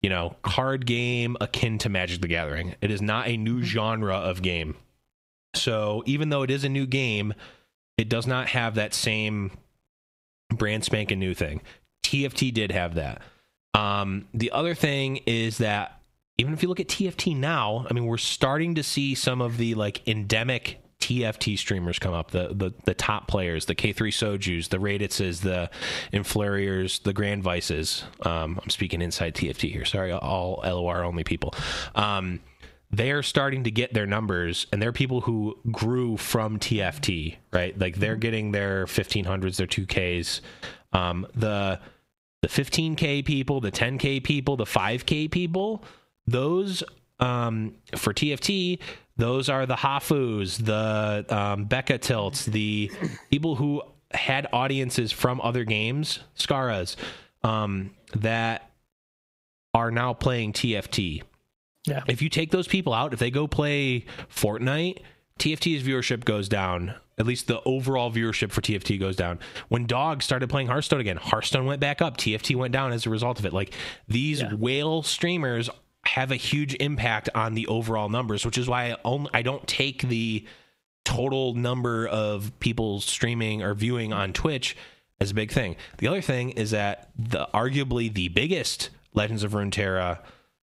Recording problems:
squashed, flat; heavily

